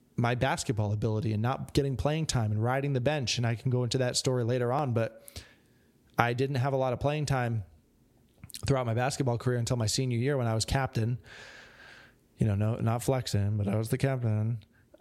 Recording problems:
squashed, flat; somewhat

